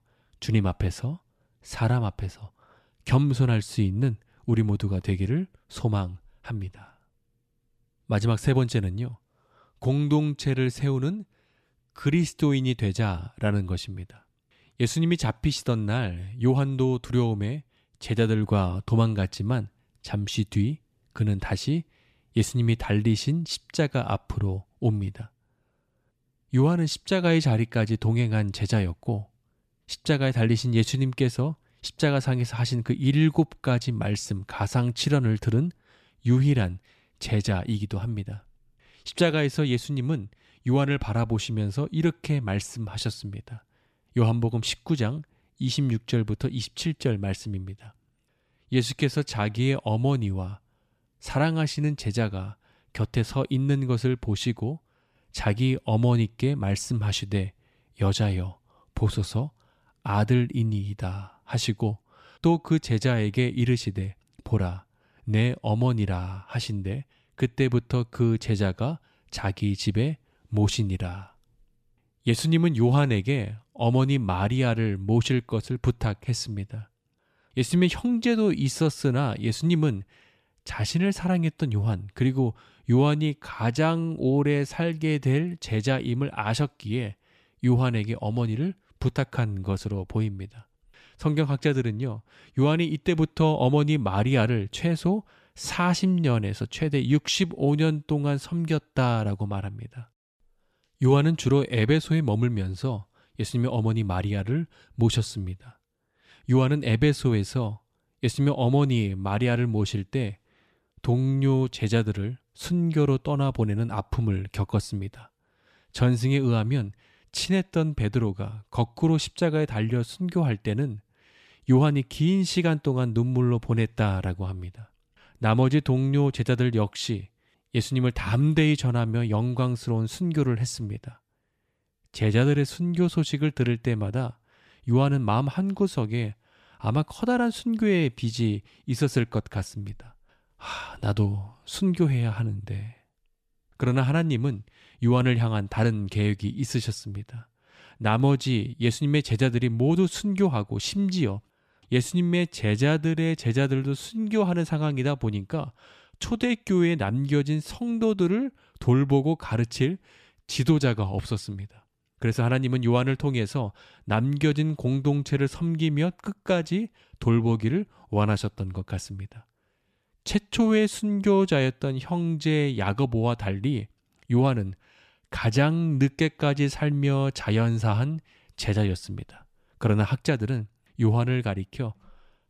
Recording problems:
none

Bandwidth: 14.5 kHz